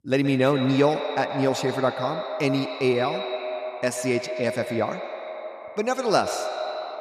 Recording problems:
echo of what is said; strong; throughout; 120 ms later, 7 dB below the speech

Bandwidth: 14 kHz